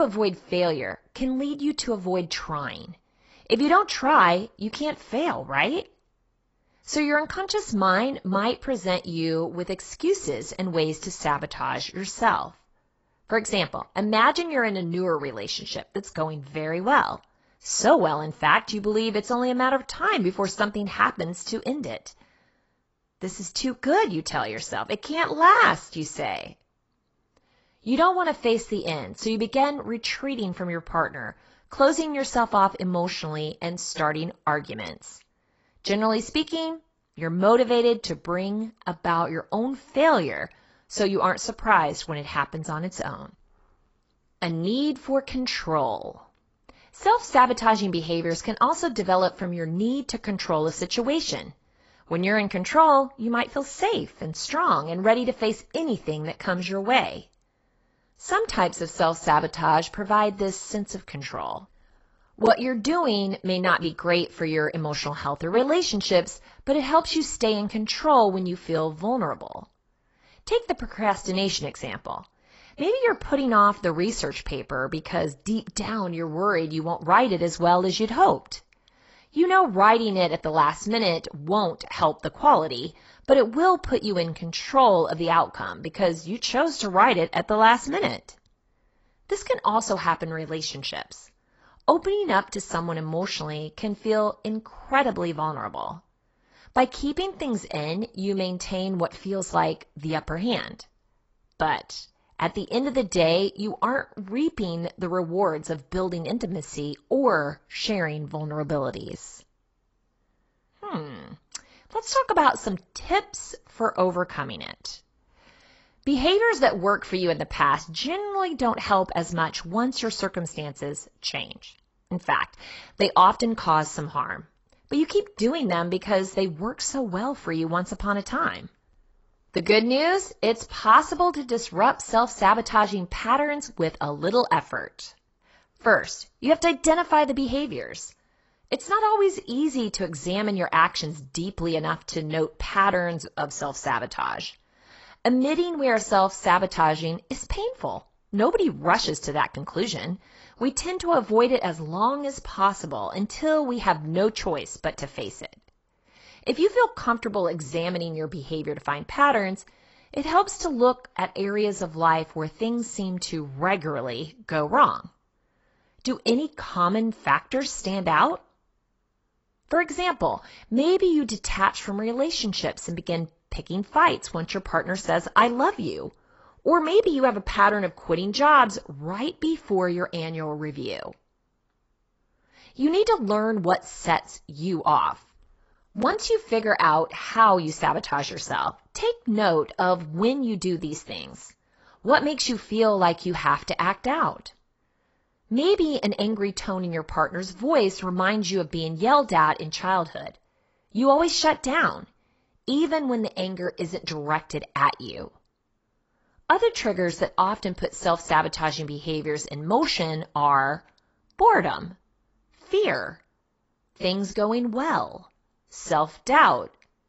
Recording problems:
garbled, watery; badly; nothing above 8 kHz
abrupt cut into speech; at the start

